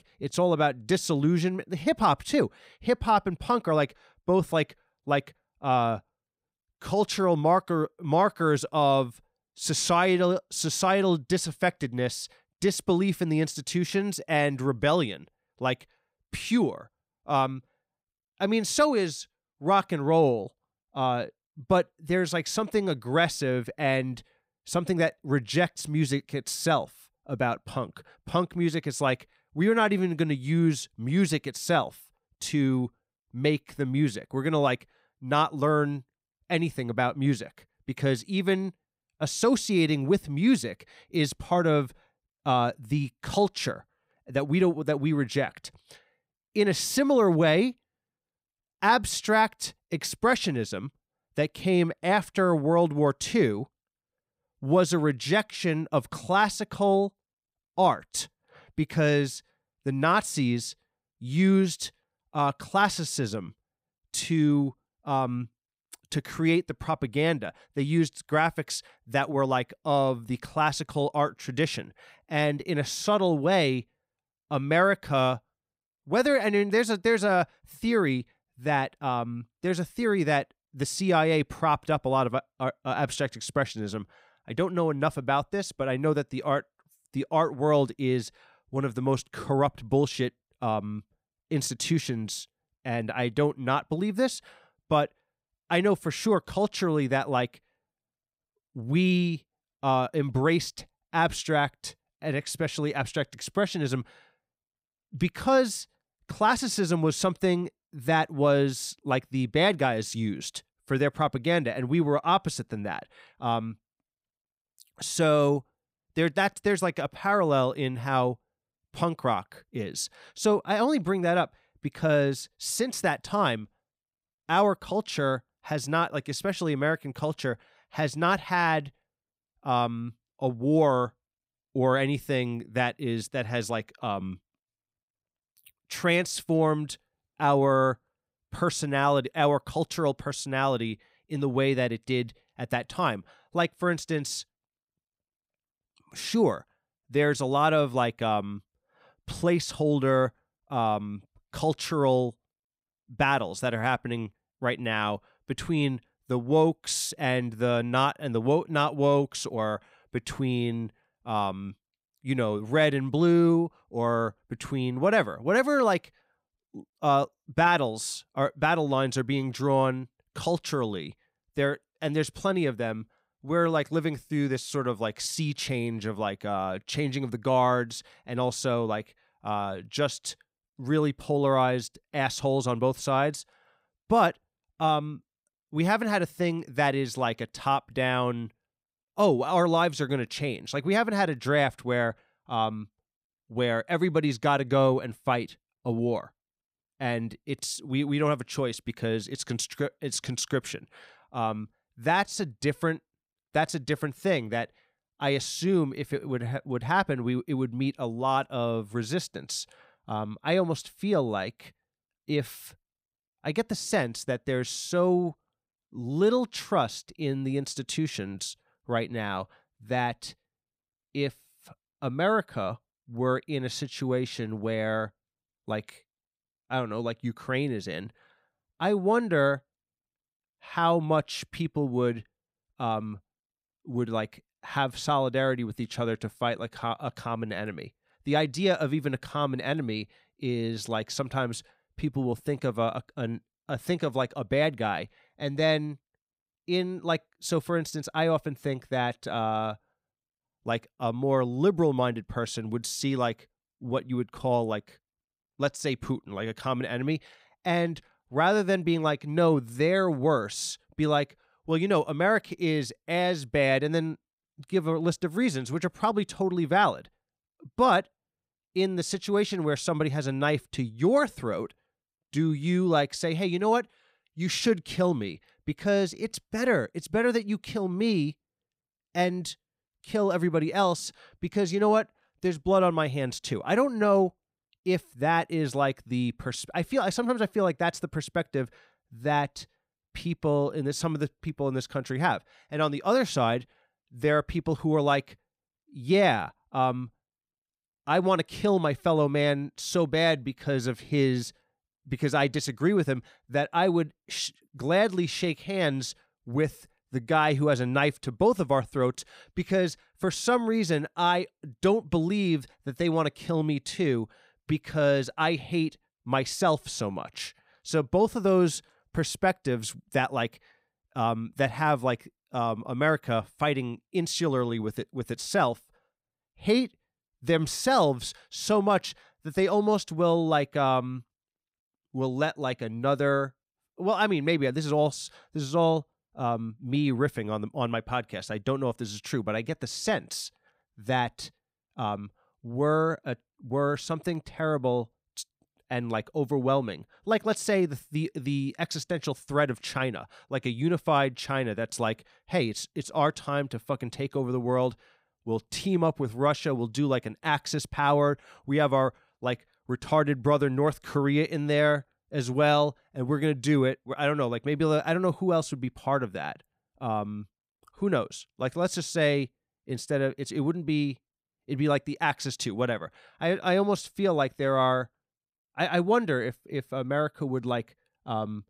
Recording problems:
none

